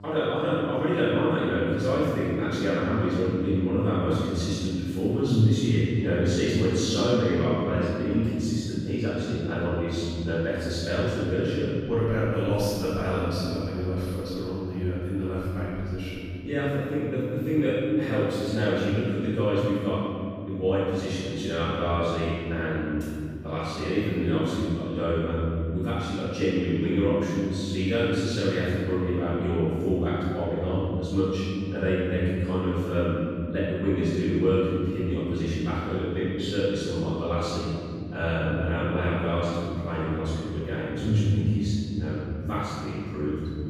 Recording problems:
room echo; strong; dies away in 2.4 s
off-mic speech; far
electrical hum; faint; throughout; 50 Hz, 25 dB below the speech

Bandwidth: 14.5 kHz